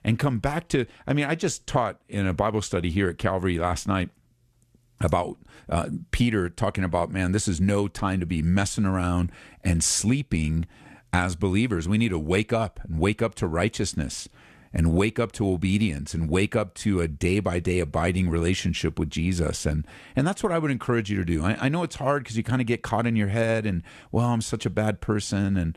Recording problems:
none

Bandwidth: 13.5 kHz